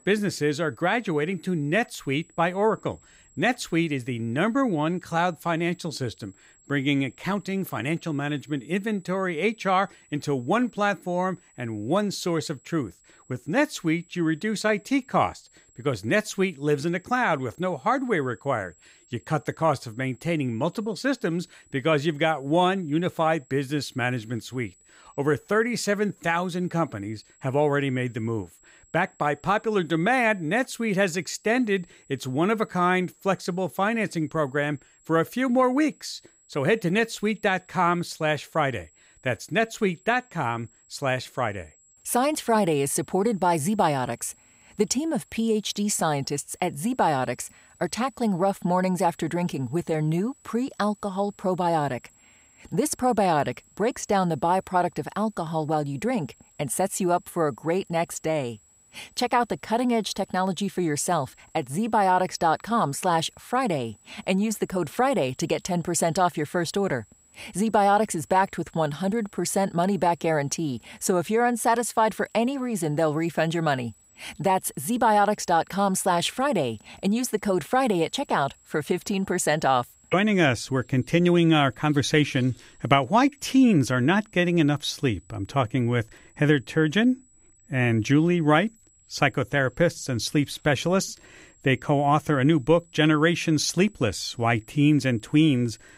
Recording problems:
high-pitched whine; faint; throughout; 7.5 kHz, 30 dB below the speech

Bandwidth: 15.5 kHz